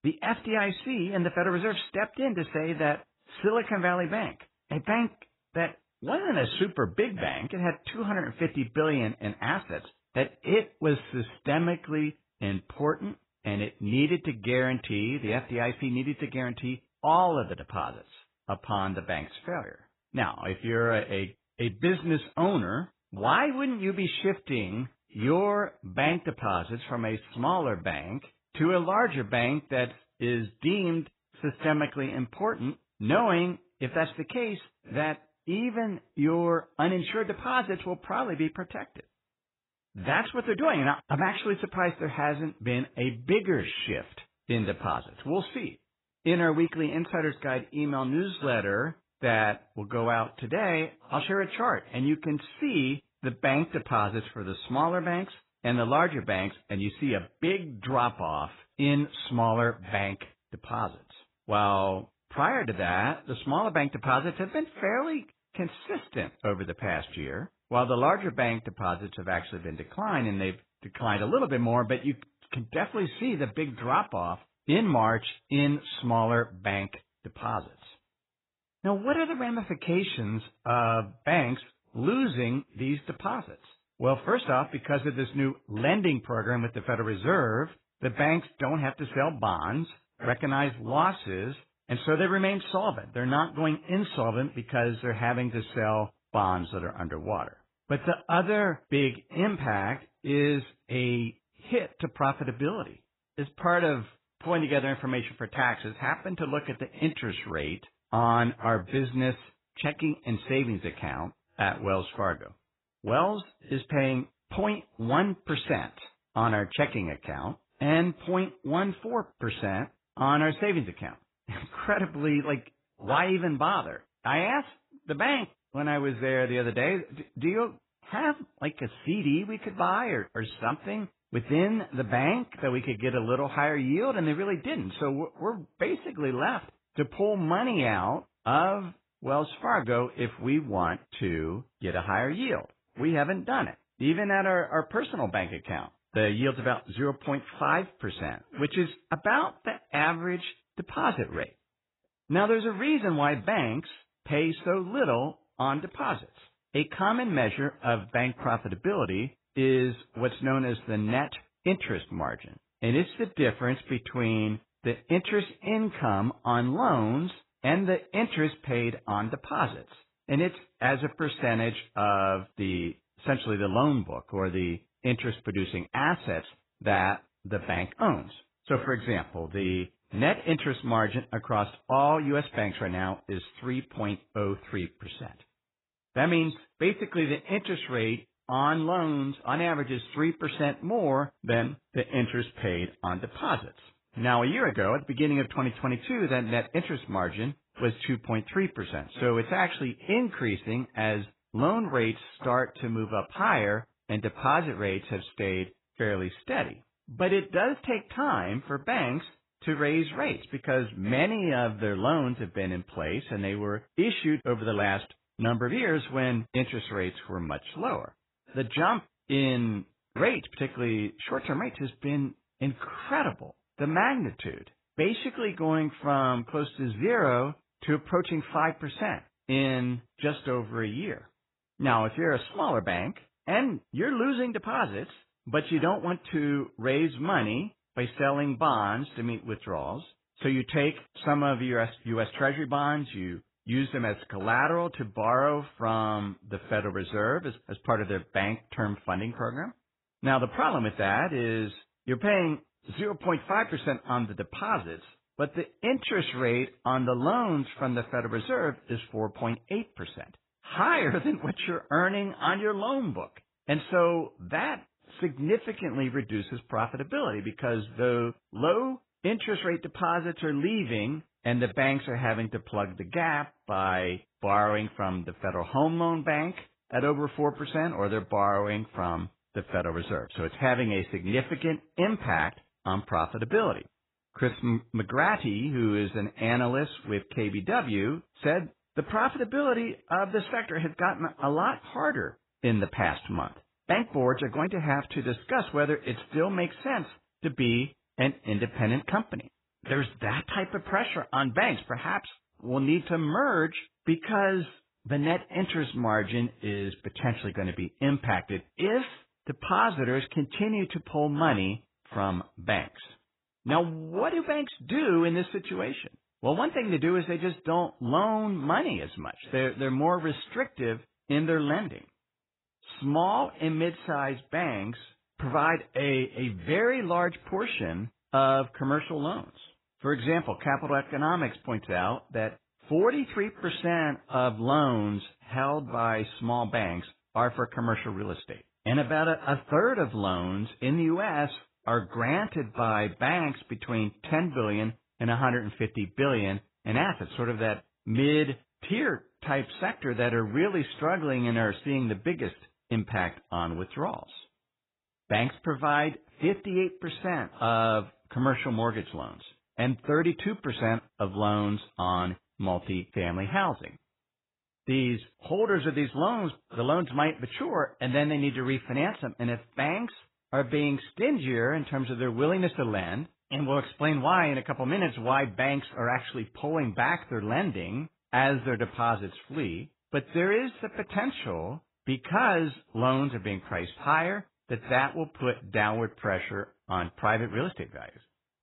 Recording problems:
garbled, watery; badly; nothing above 4 kHz

